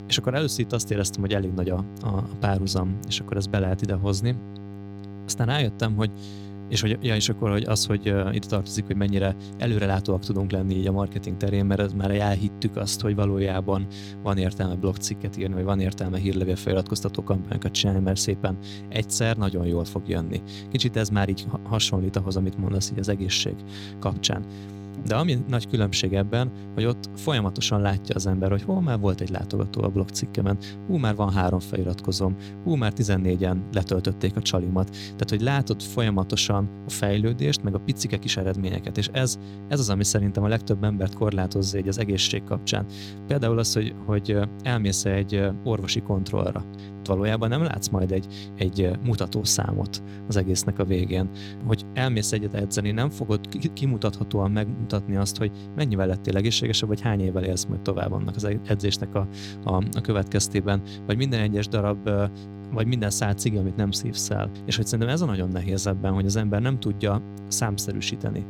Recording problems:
electrical hum; noticeable; throughout; 50 Hz, 15 dB below the speech

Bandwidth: 17.5 kHz